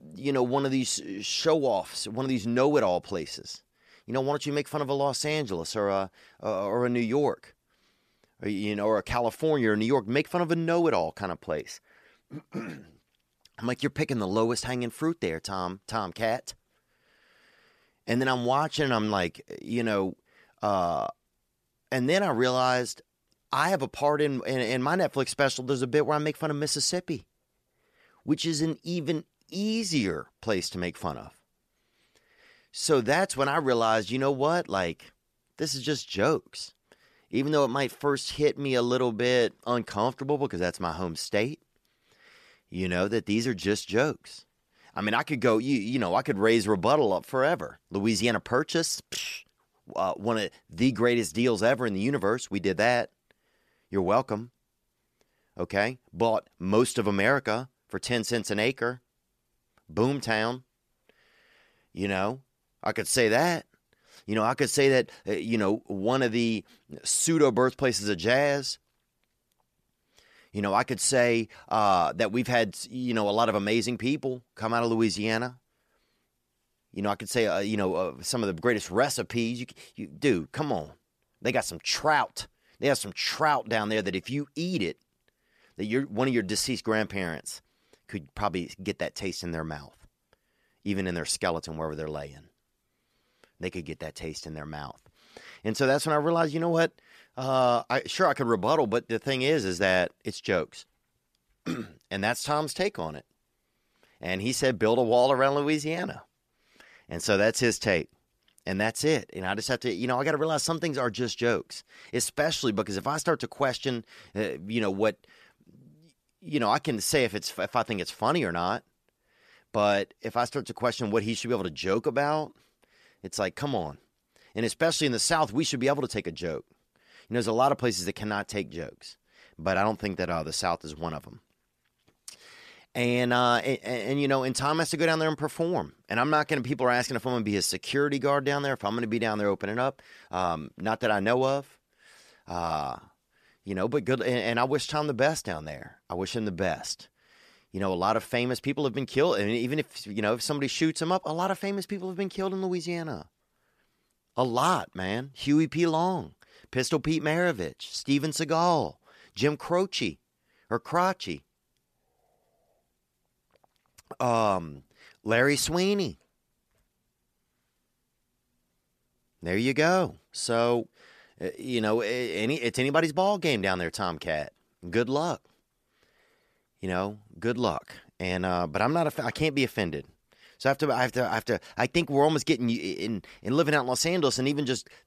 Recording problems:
none

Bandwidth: 14.5 kHz